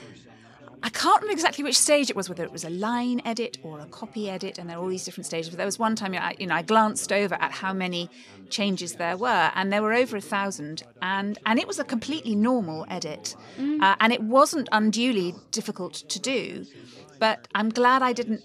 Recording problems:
background chatter; faint; throughout; 4 voices, 25 dB below the speech

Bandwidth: 14.5 kHz